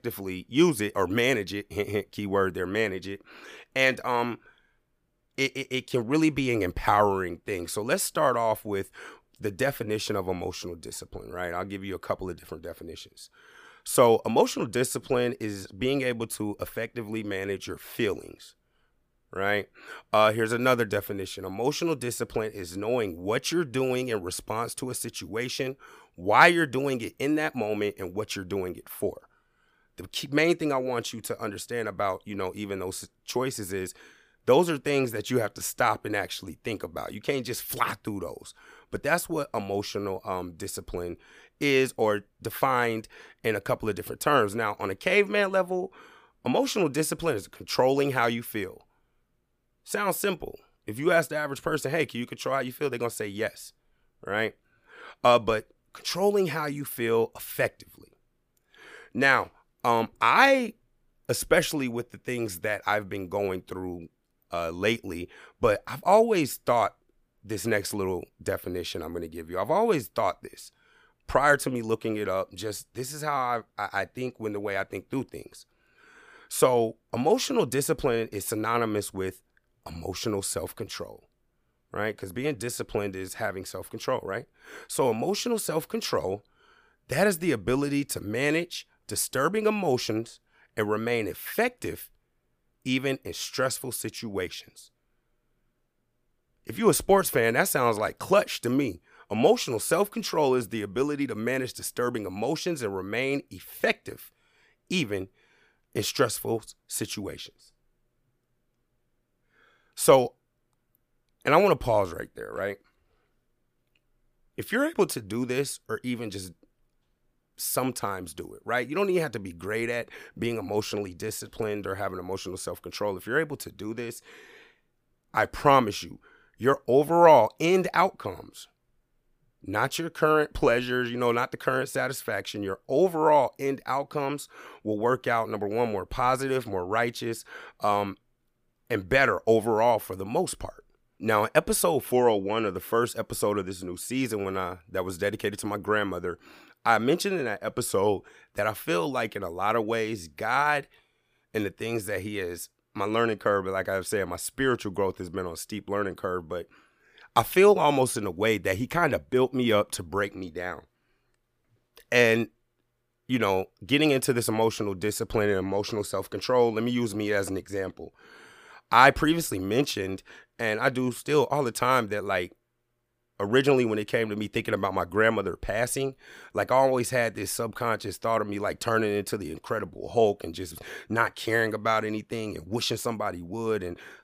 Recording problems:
none

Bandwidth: 15 kHz